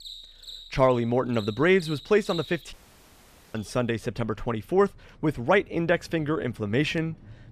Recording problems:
animal sounds; noticeable; throughout; 20 dB below the speech
audio cutting out; at 2.5 s for 1 s

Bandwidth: 14.5 kHz